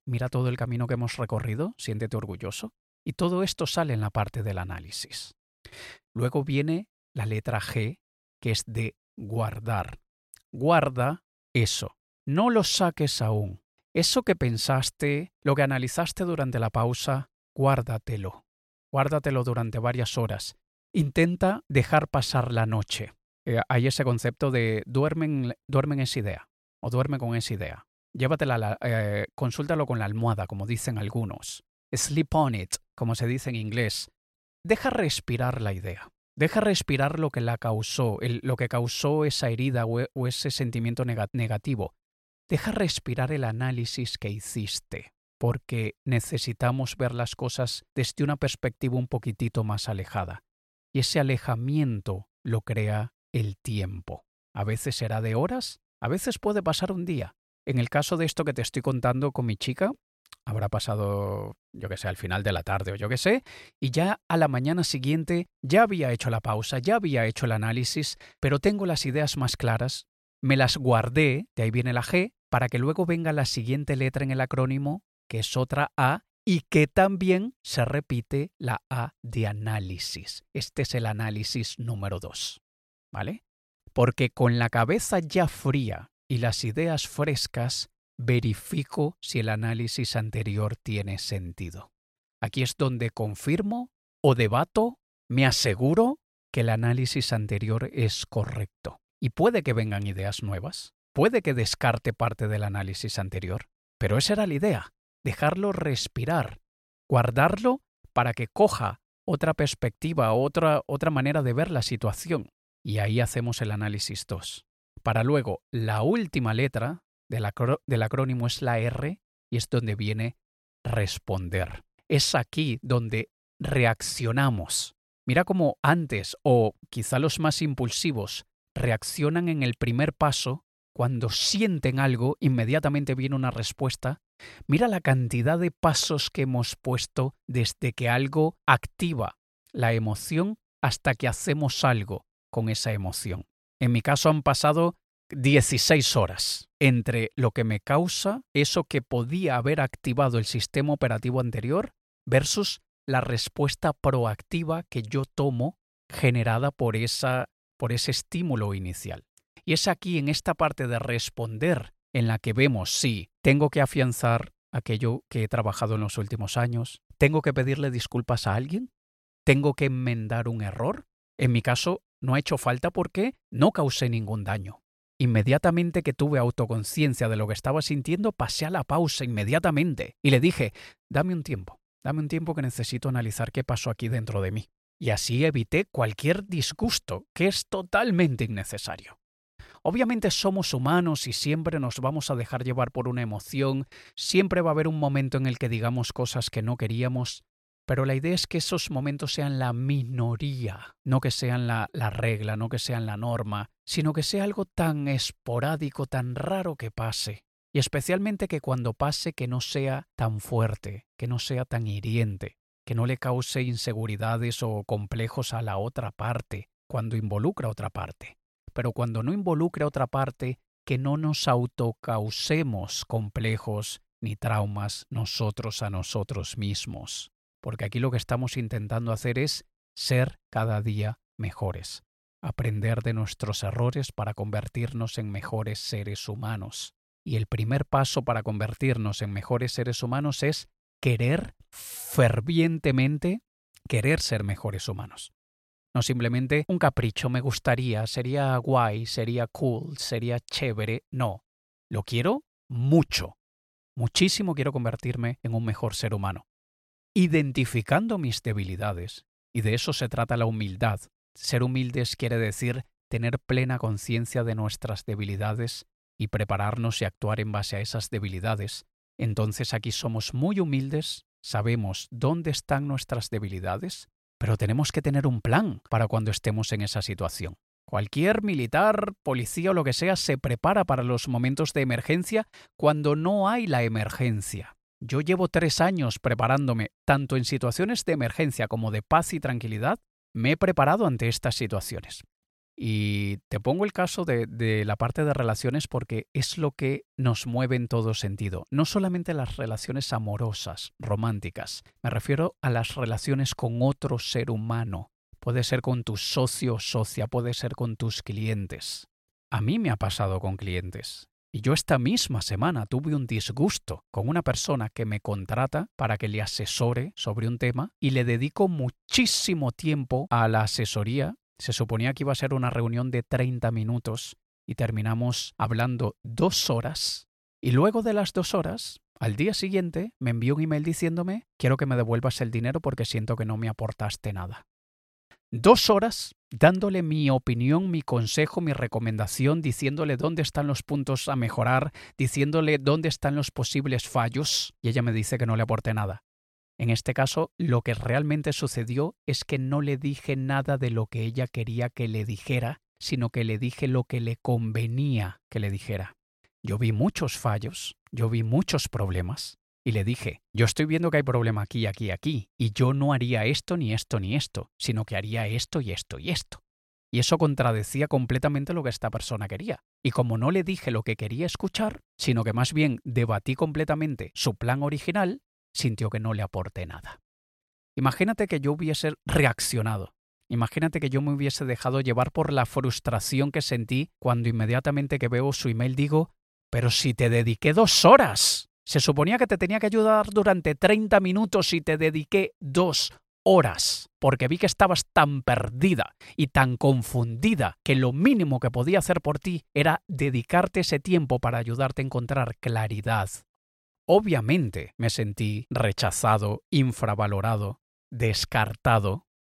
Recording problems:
none

